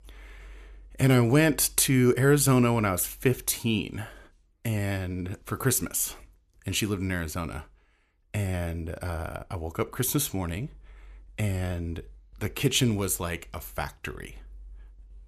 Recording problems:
none

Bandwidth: 14 kHz